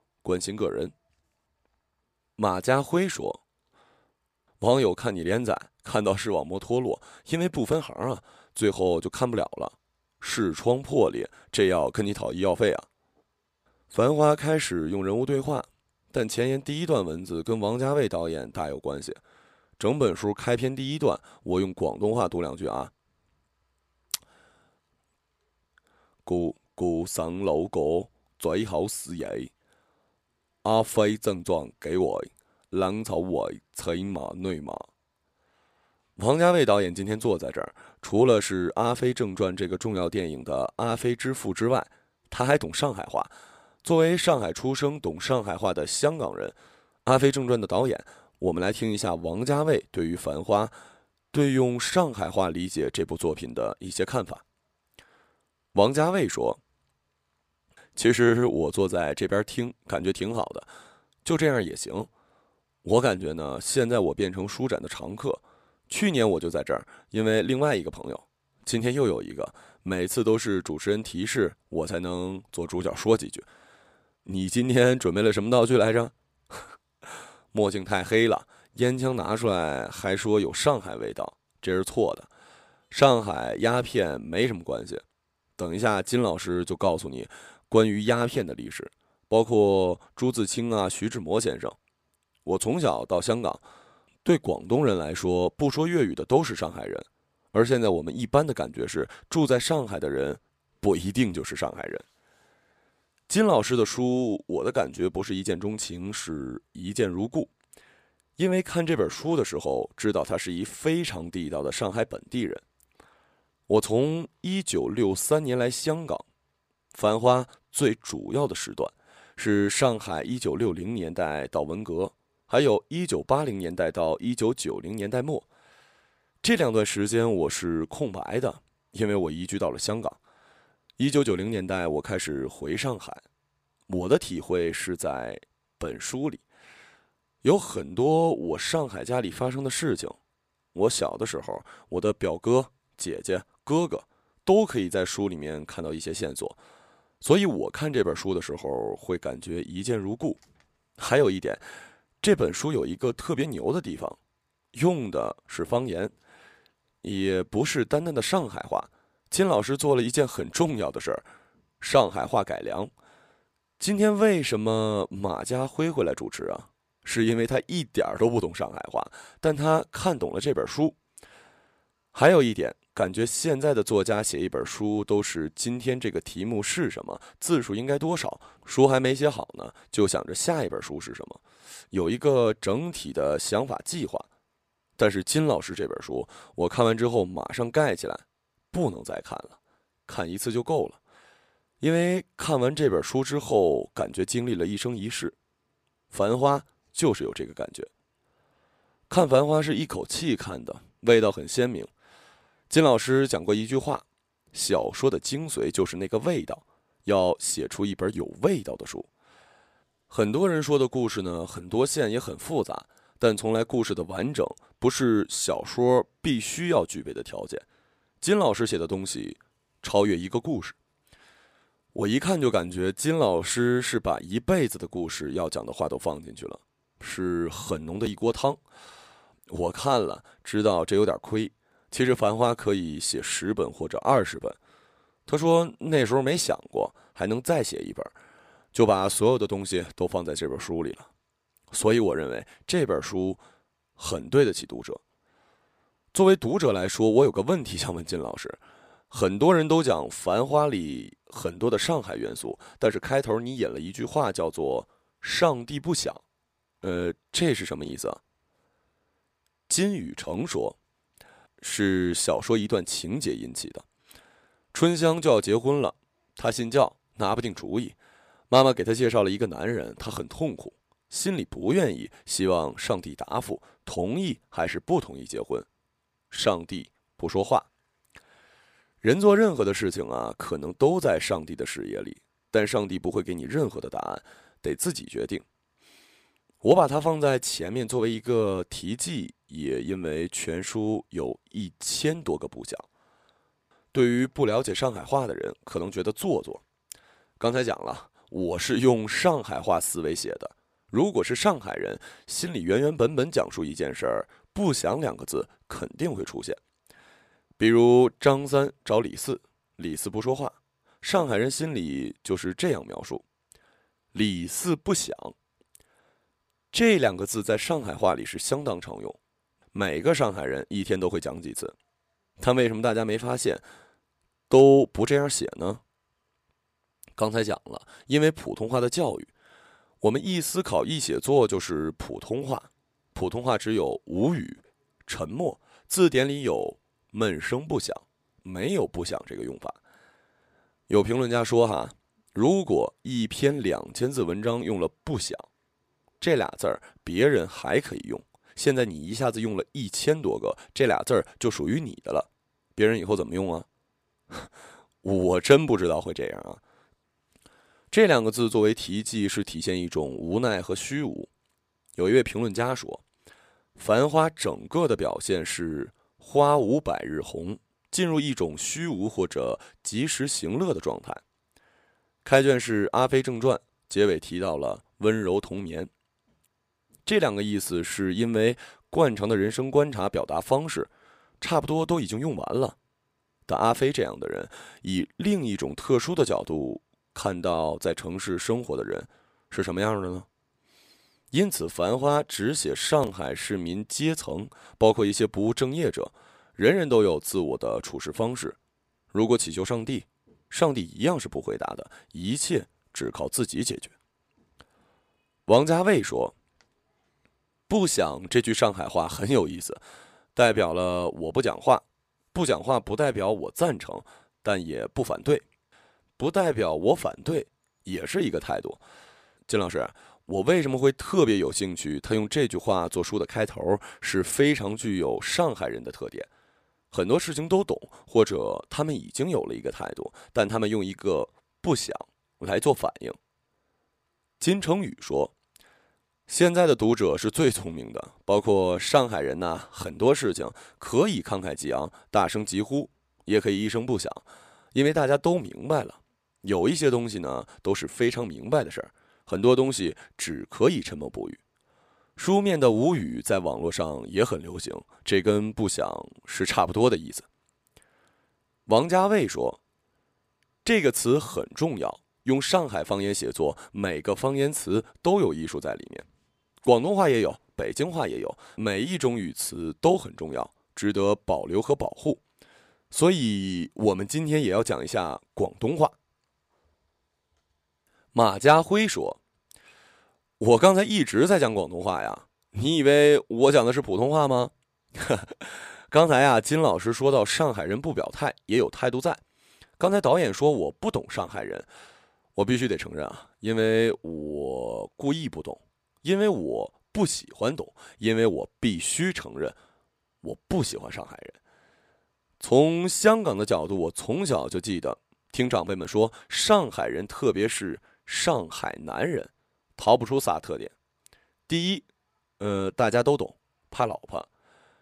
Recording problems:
none

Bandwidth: 15 kHz